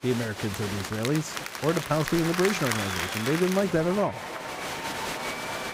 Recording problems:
crowd noise; loud; throughout; 4 dB below the speech

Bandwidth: 15.5 kHz